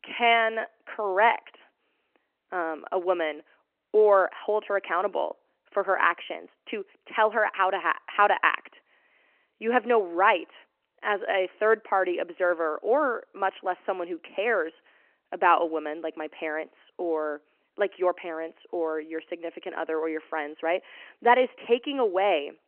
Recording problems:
phone-call audio

